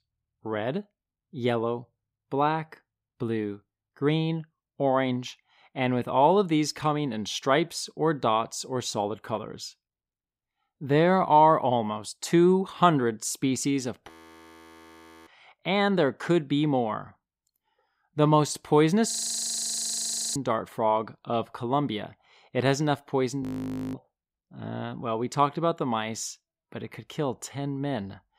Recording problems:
audio freezing; at 14 s for 1 s, at 19 s for 1 s and at 23 s for 0.5 s

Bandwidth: 15.5 kHz